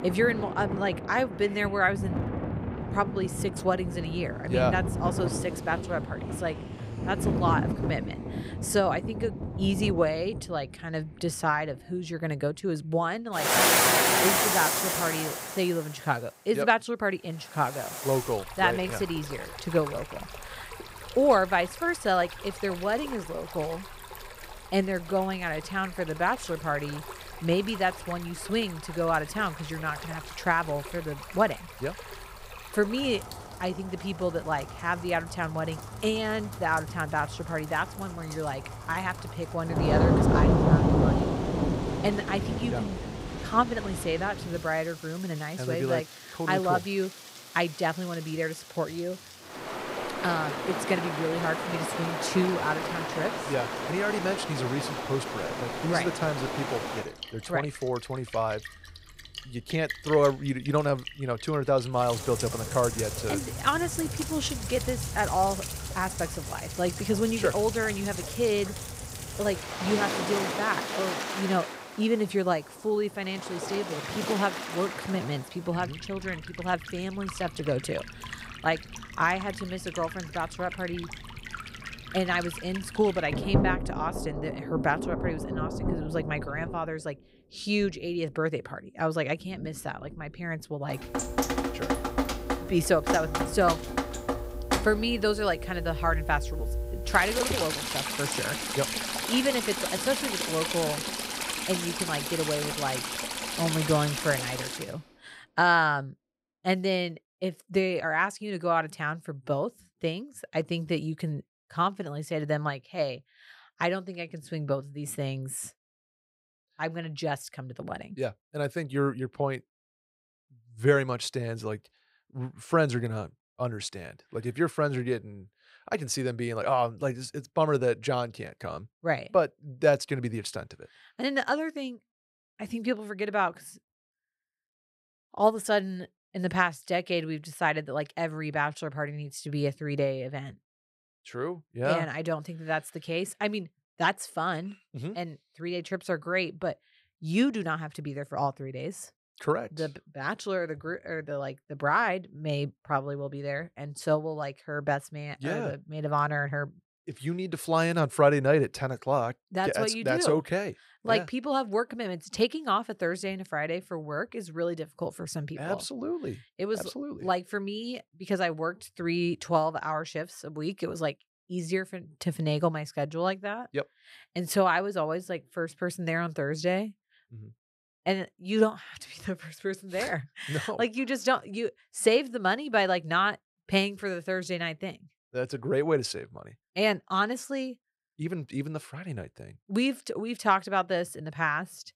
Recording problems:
rain or running water; loud; until 1:45; 2 dB below the speech

